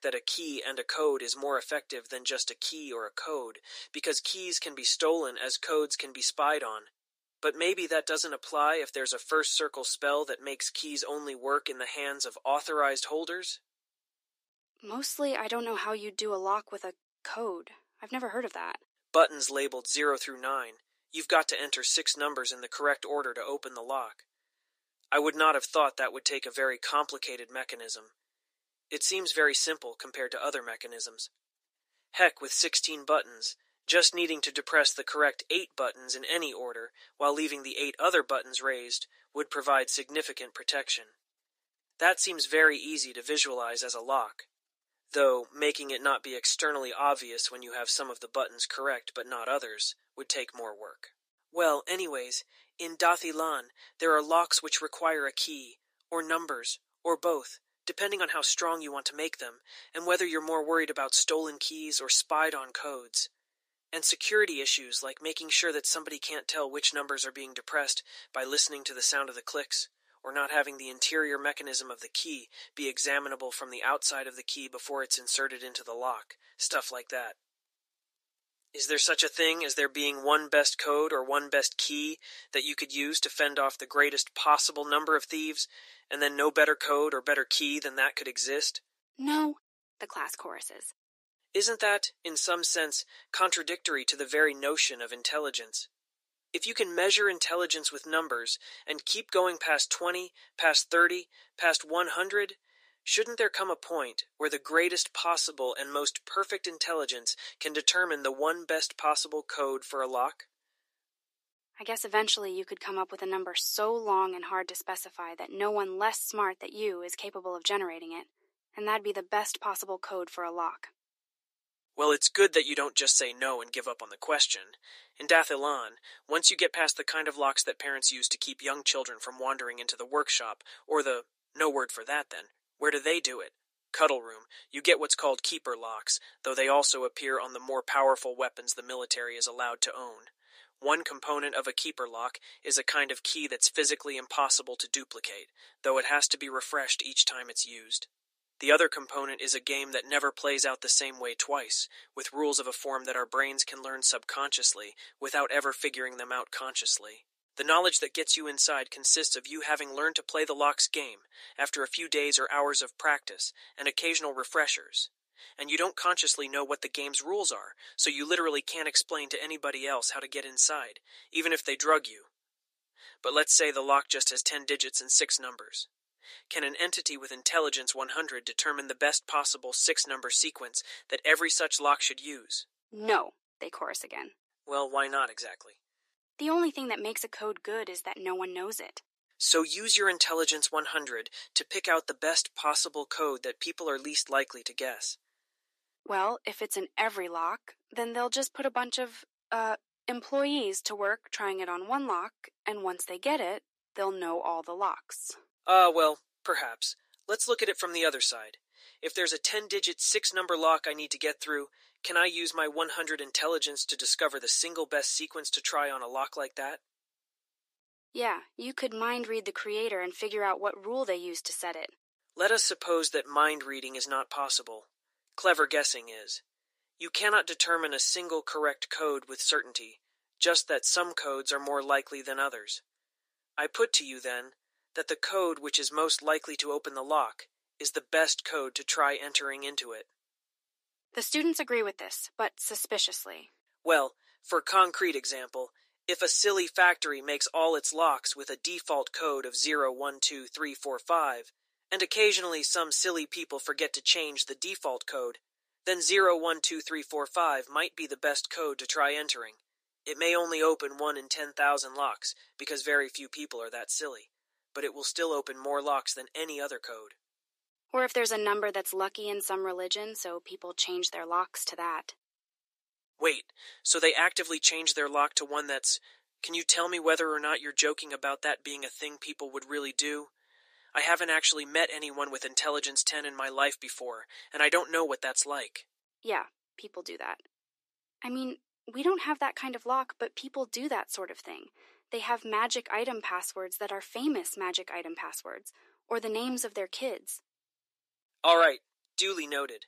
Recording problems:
thin; somewhat; fading below 300 Hz

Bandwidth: 14.5 kHz